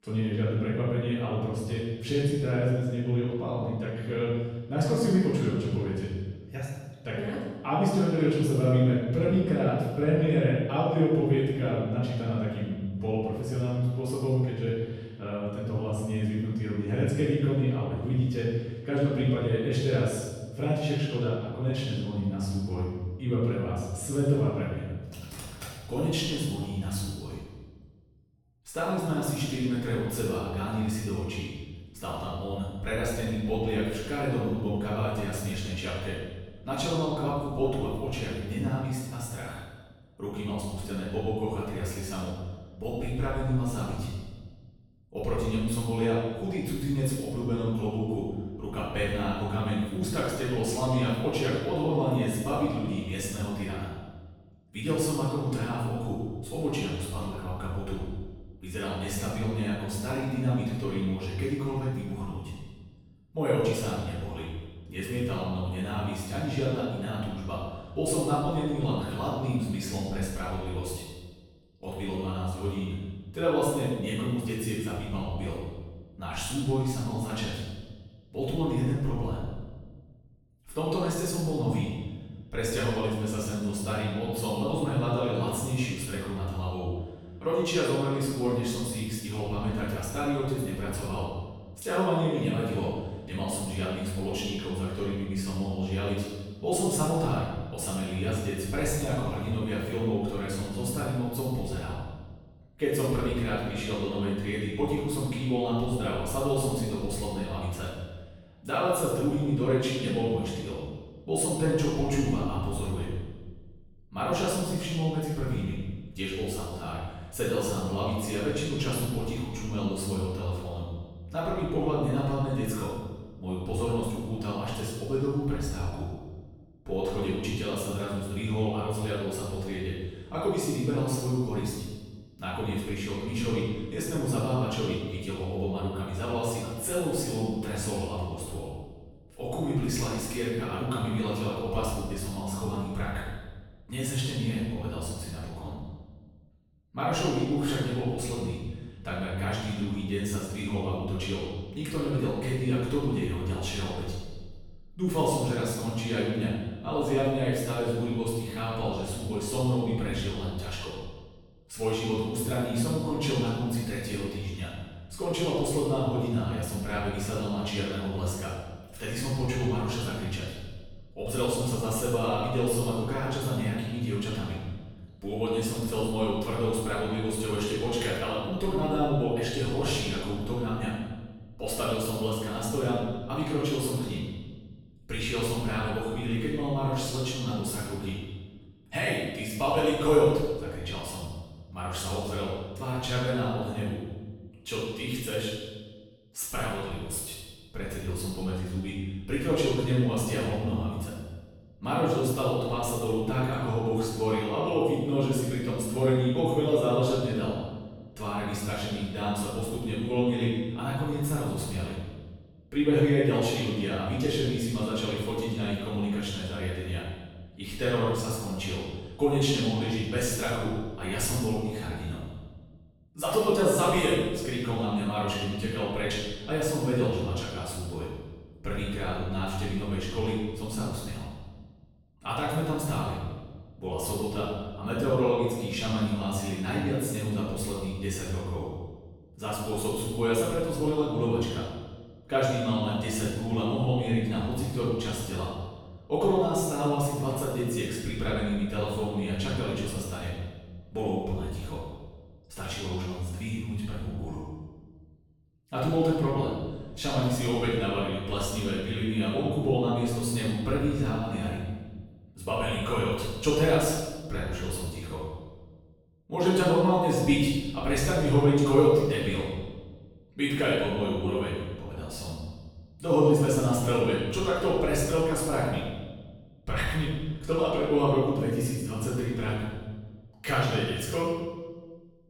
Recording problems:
room echo; strong; dies away in 1.2 s
off-mic speech; far

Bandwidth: 18.5 kHz